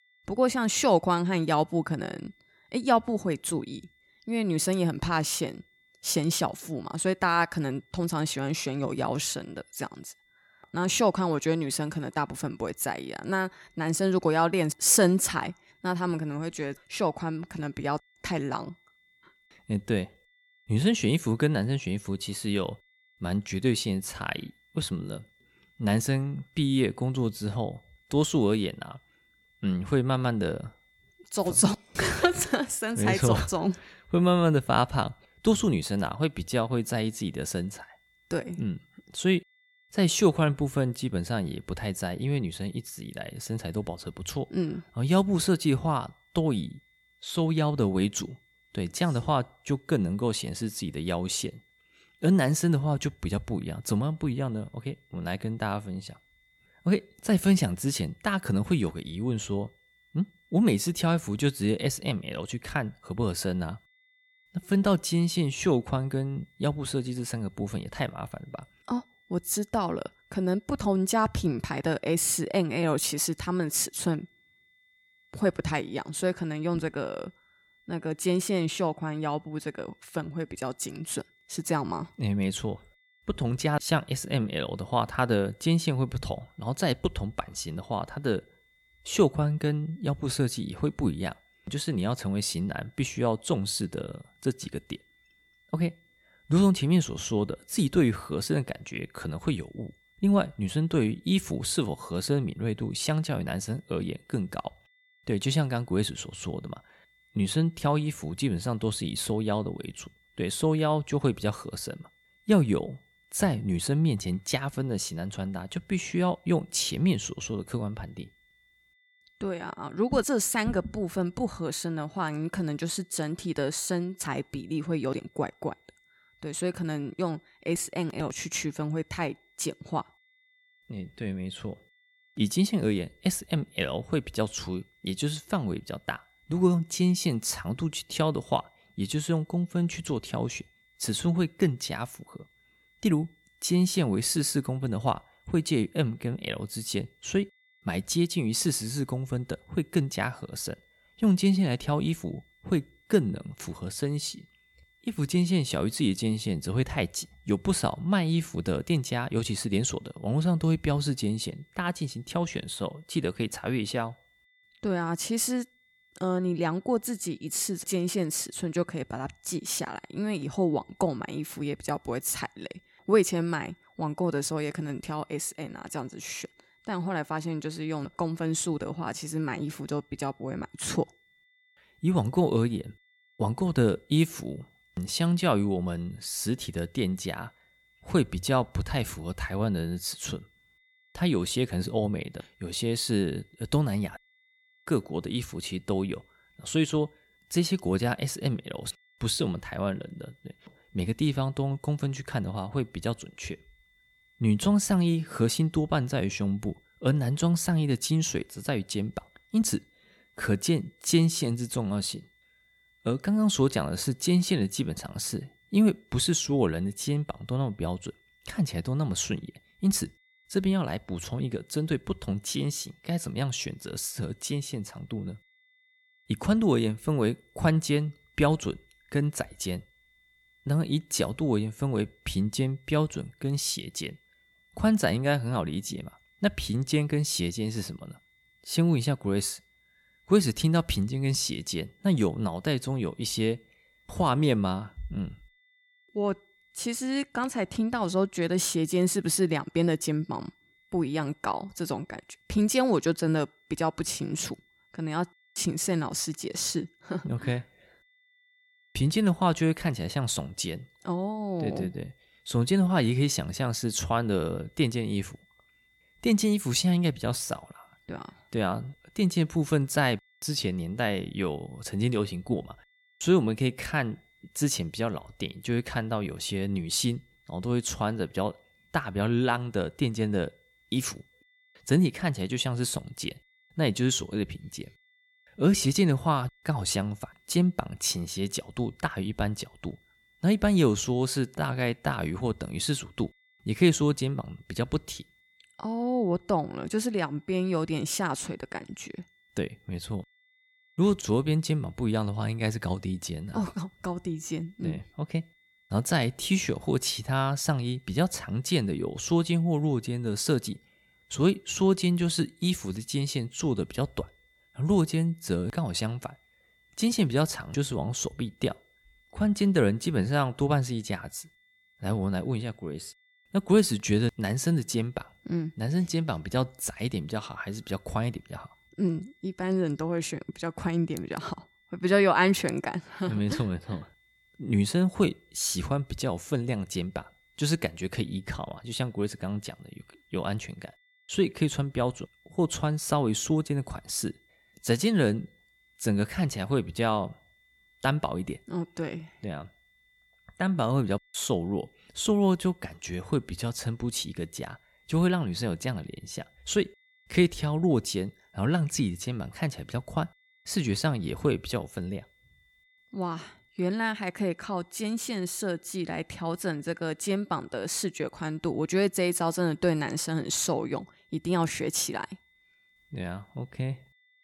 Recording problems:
high-pitched whine; faint; throughout; 2 kHz, 35 dB below the speech

